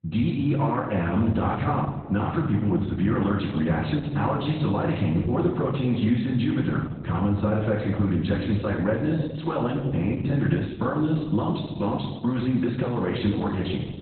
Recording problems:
off-mic speech; far
garbled, watery; badly; nothing above 4 kHz
room echo; noticeable; dies away in 1.2 s

